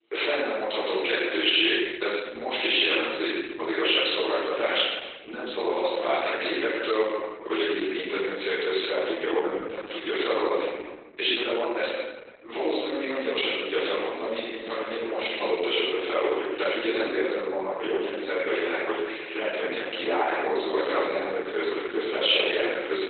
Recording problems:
room echo; strong; dies away in 1.3 s
off-mic speech; far
garbled, watery; badly; nothing above 4 kHz
thin; very; fading below 350 Hz

